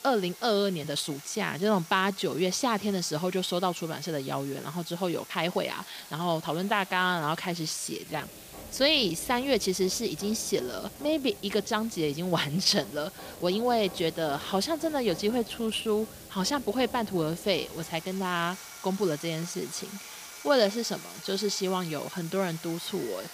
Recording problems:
machinery noise; noticeable; throughout; 20 dB below the speech
hiss; noticeable; throughout; 20 dB below the speech
uneven, jittery; strongly; from 1 to 22 s

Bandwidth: 15 kHz